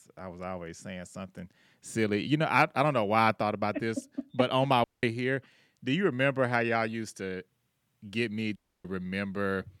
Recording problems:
audio cutting out; at 5 s and at 8.5 s

